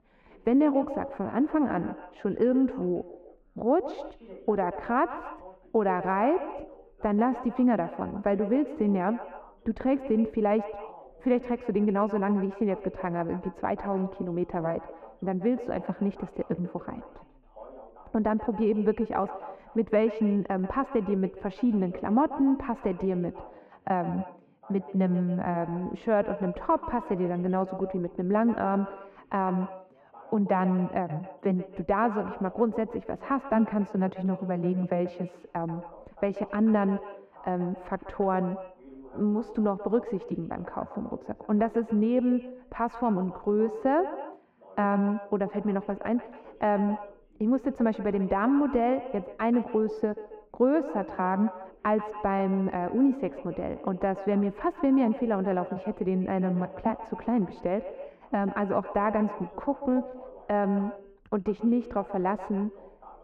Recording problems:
muffled; very; fading above 3 kHz
echo of what is said; noticeable; throughout; 140 ms later, 15 dB below the speech
background chatter; faint; throughout; 2 voices, 25 dB below the speech

